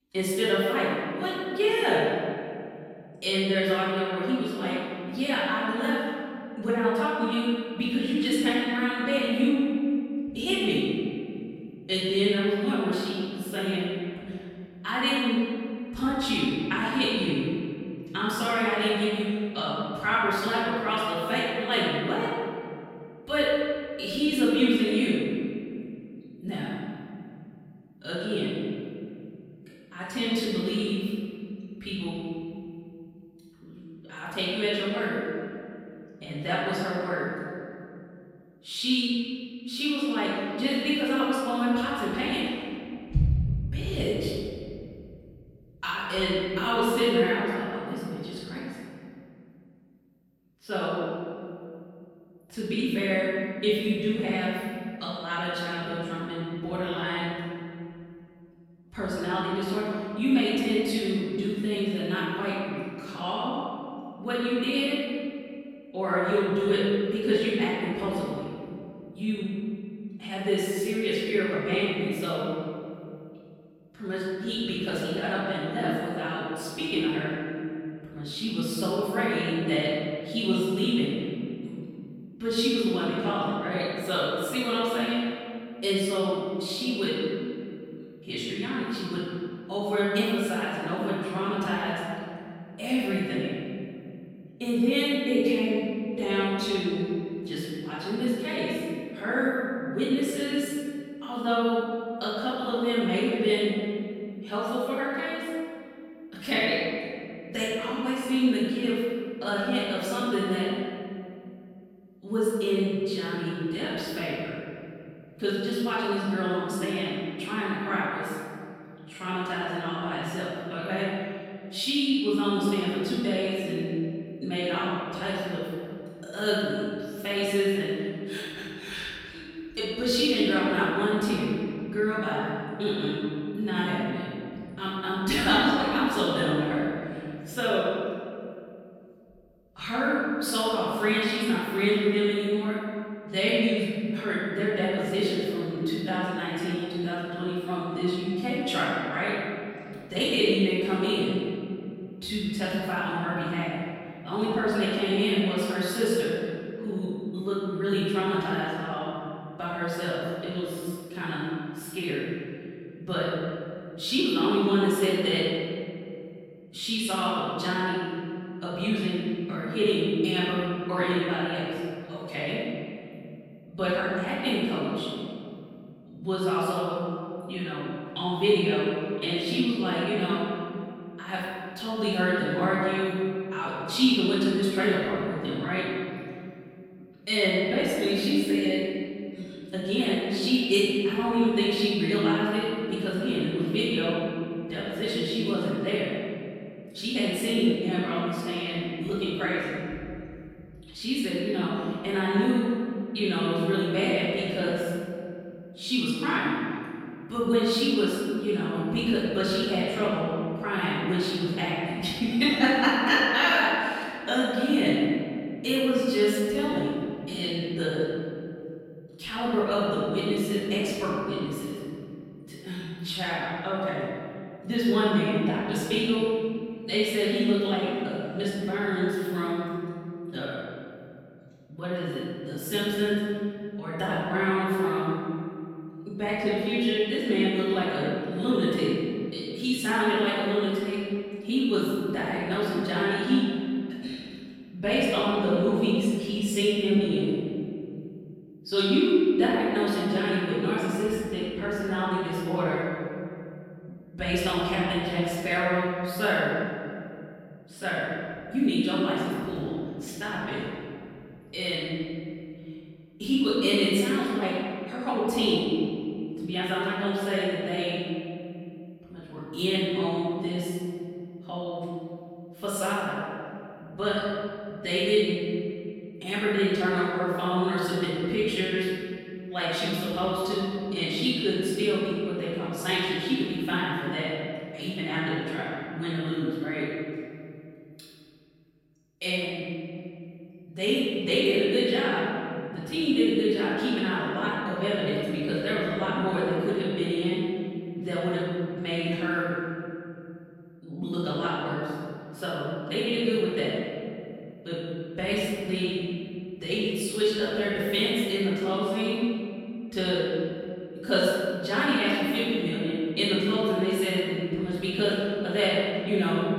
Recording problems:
room echo; strong; dies away in 2.6 s
off-mic speech; far

